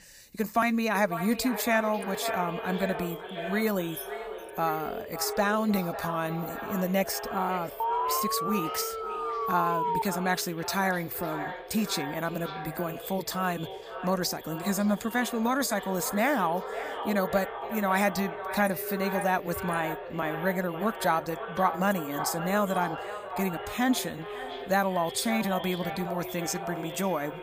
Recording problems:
echo of what is said; strong; throughout; 550 ms later, 8 dB below the speech
jangling keys; faint; at 4 s; peak 10 dB below the speech
alarm; loud; from 8 to 10 s; peak 1 dB above the speech

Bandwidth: 15 kHz